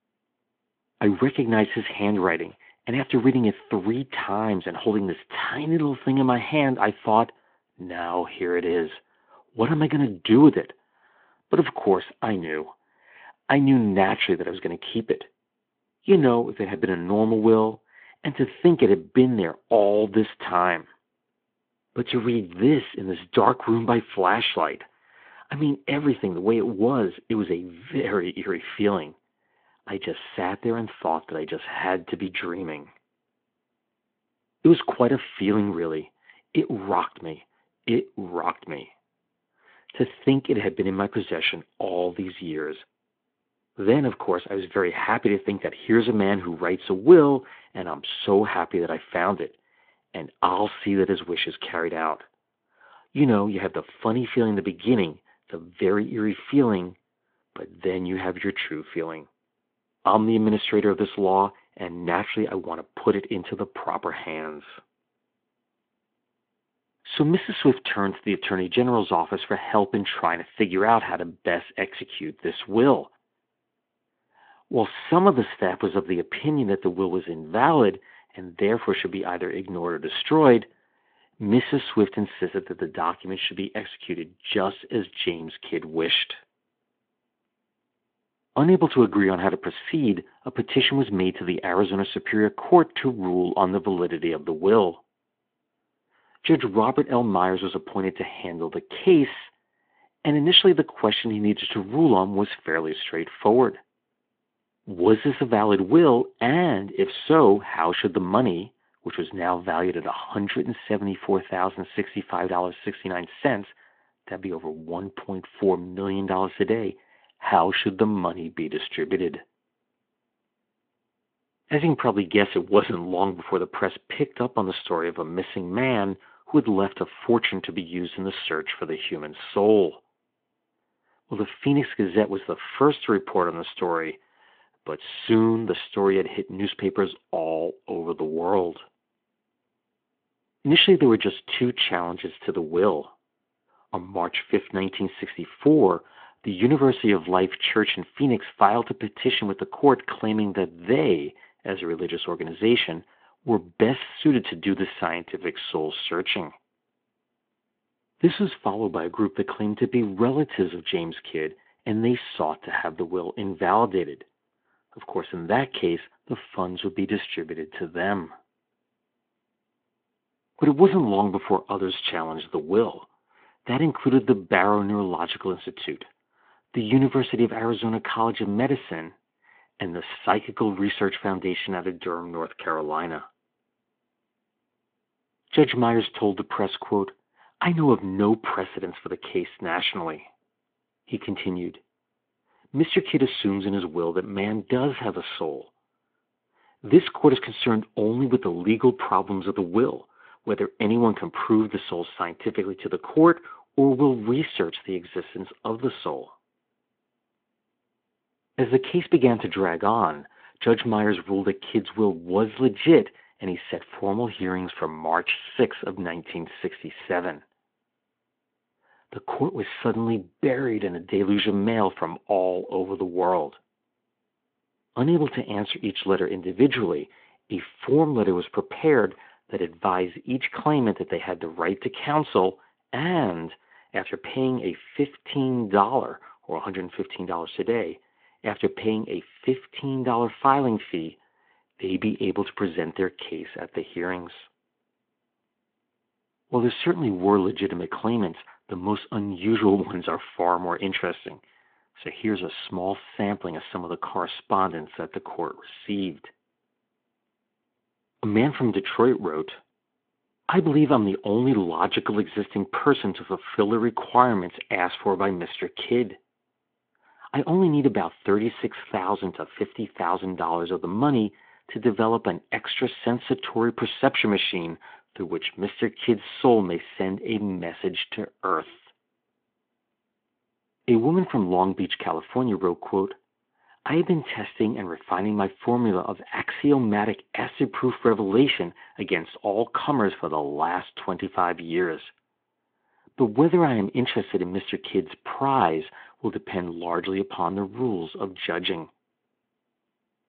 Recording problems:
phone-call audio

